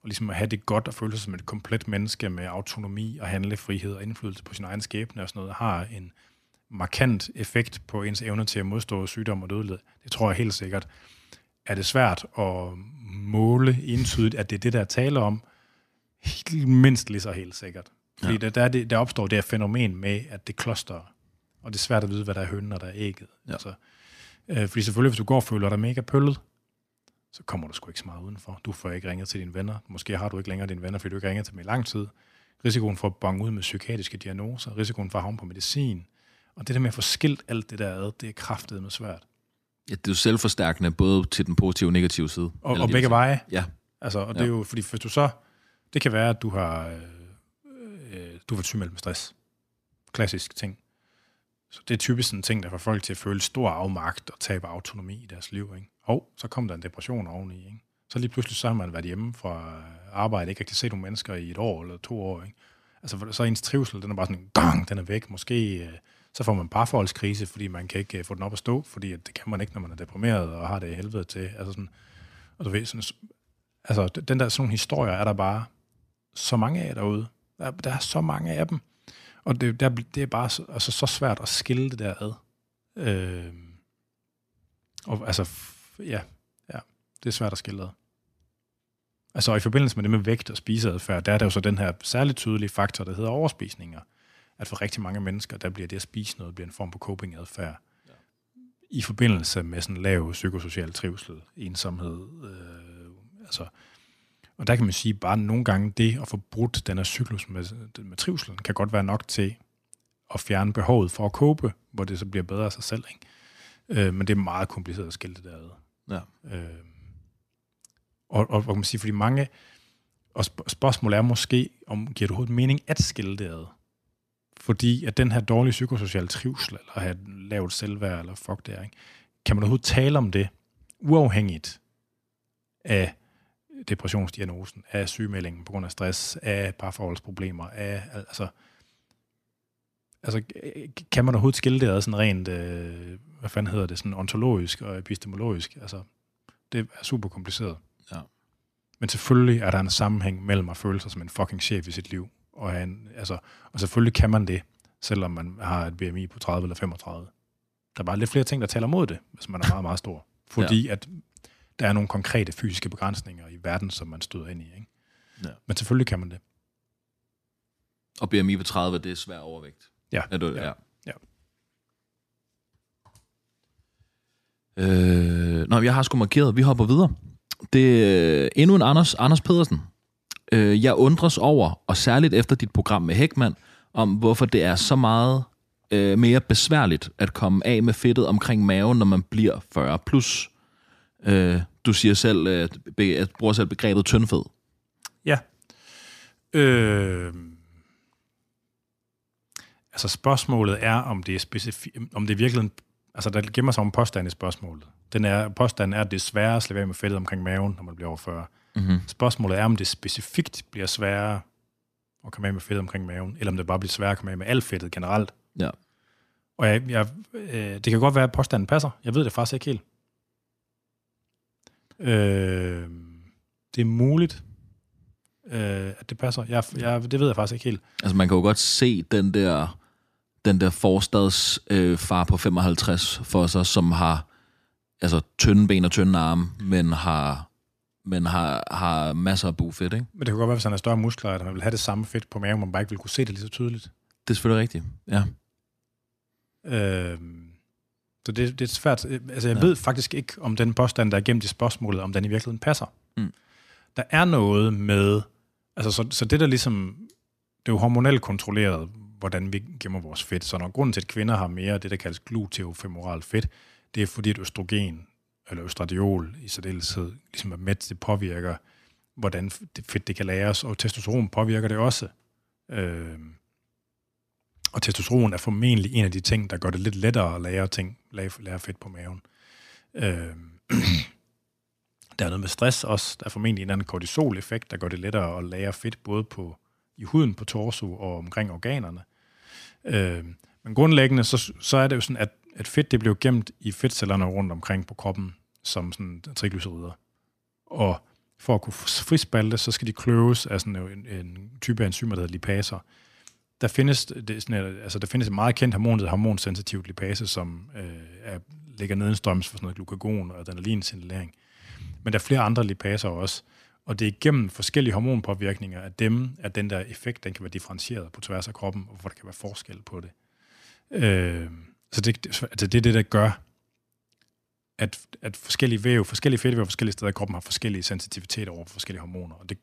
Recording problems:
none

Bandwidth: 14.5 kHz